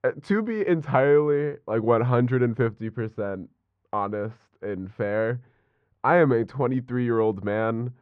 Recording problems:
muffled; very; fading above 1.5 kHz

